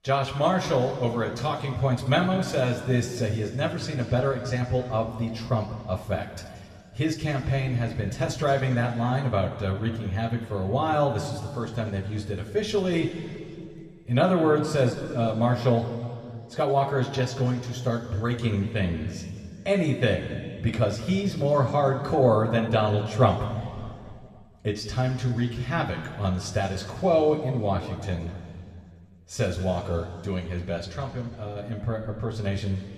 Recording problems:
room echo; noticeable; dies away in 2.1 s
off-mic speech; somewhat distant

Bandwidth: 14 kHz